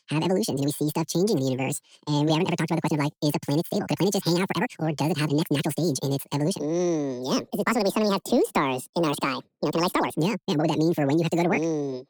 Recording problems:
wrong speed and pitch; too fast and too high; 1.7 times normal speed
uneven, jittery; strongly; from 0.5 to 11 s

